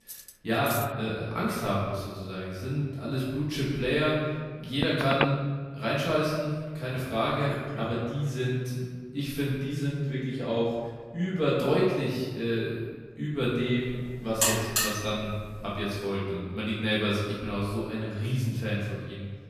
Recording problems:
off-mic speech; far
room echo; noticeable; dies away in 1.3 s
clattering dishes; noticeable; at the start; peak 6 dB below the speech
phone ringing; loud; at 5 s; peak 1 dB above the speech
alarm; loud; from 14 to 15 s; peak 6 dB above the speech

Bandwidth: 14.5 kHz